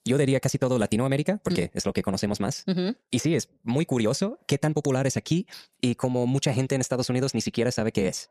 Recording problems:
wrong speed, natural pitch; too fast; 1.7 times normal speed

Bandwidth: 14.5 kHz